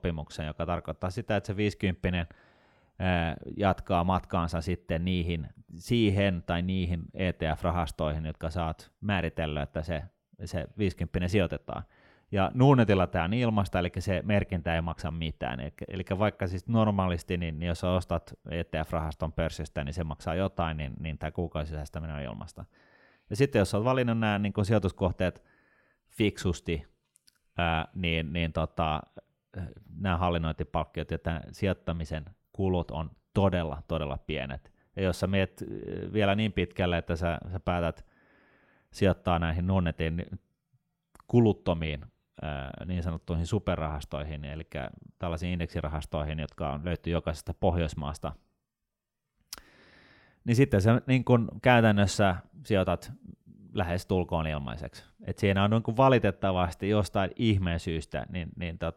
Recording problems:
none

